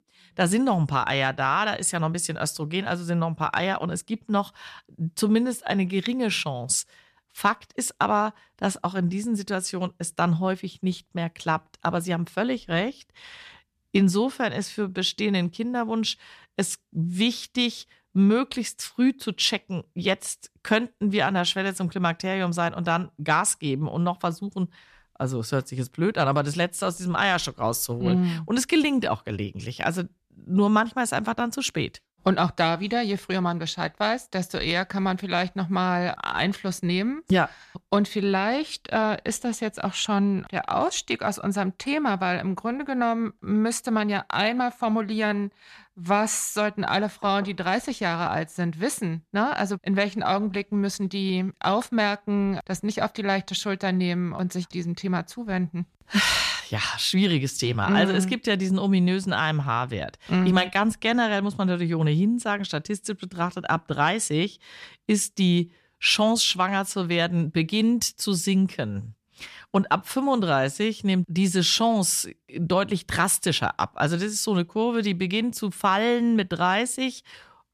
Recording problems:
none

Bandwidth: 14 kHz